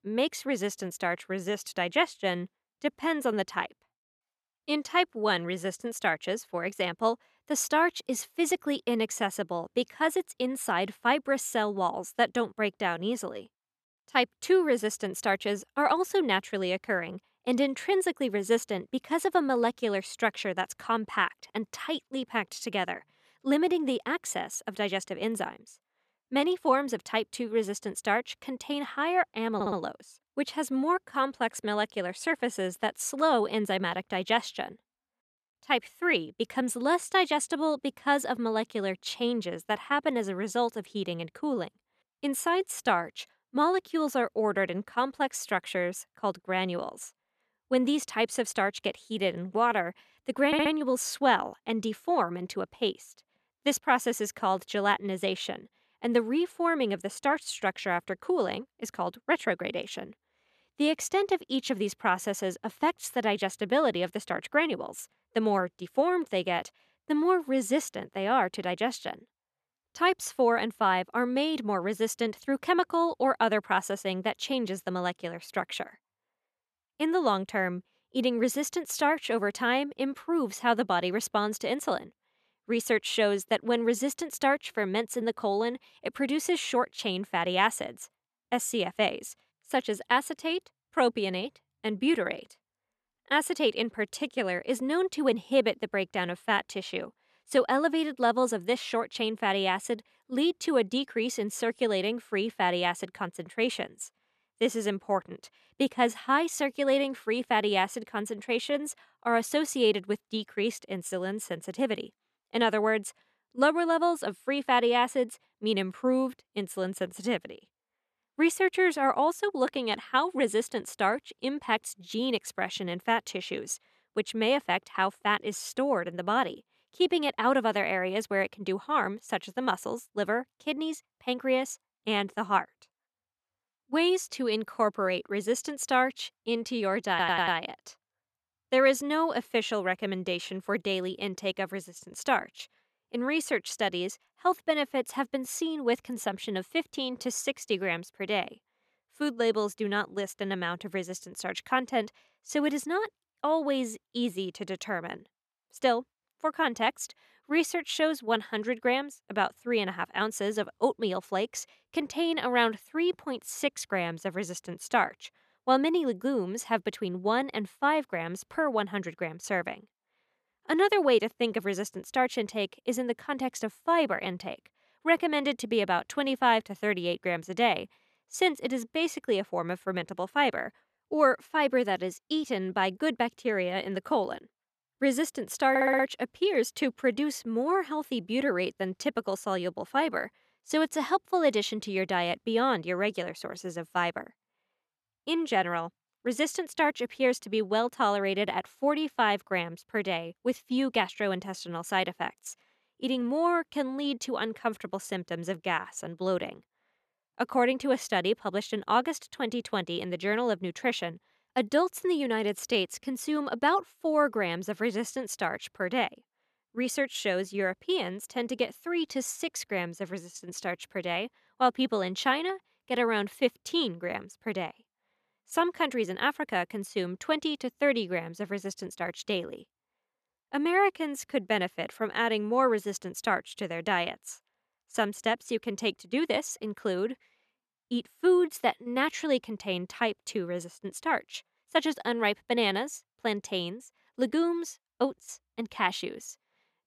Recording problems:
audio stuttering; 4 times, first at 30 s

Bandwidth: 13.5 kHz